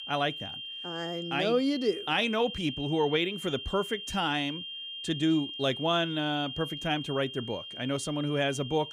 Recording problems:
high-pitched whine; loud; throughout; 3 kHz, 8 dB below the speech

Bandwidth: 15.5 kHz